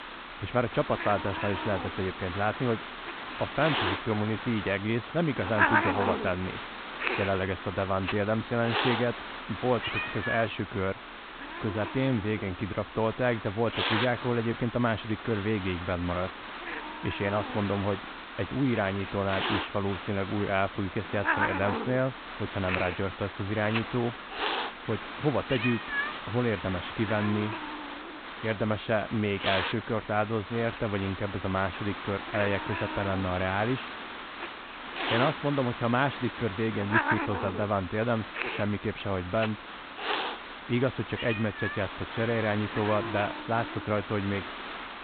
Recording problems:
high frequencies cut off; severe; nothing above 4 kHz
hiss; loud; throughout; 4 dB below the speech

